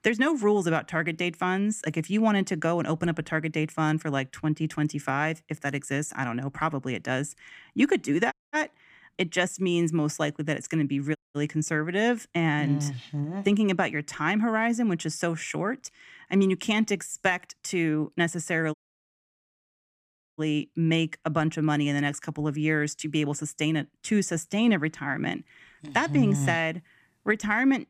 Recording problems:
audio cutting out; at 8.5 s, at 11 s and at 19 s for 1.5 s

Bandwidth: 15 kHz